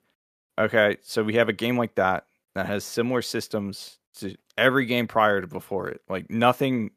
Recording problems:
none

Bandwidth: 14.5 kHz